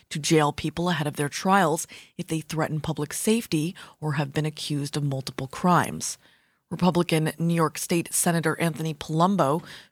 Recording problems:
none

